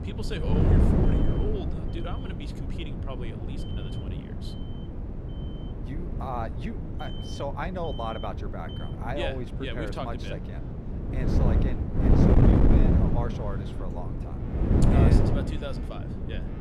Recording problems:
wind noise on the microphone; heavy; 1 dB above the speech
alarms or sirens; noticeable; throughout; 10 dB below the speech

